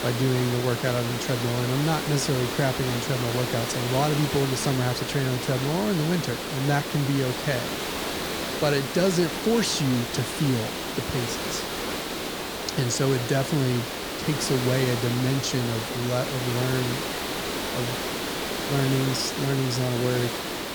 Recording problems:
hiss; loud; throughout; 3 dB below the speech

